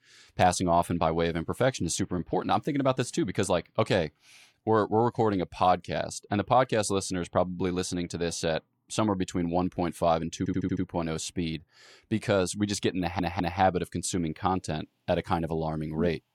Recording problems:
audio stuttering; at 10 s and at 13 s

